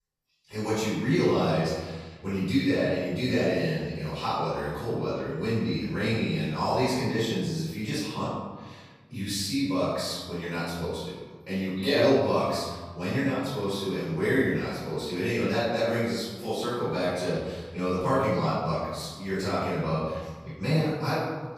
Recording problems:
room echo; strong; dies away in 1.3 s
off-mic speech; far

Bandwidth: 15 kHz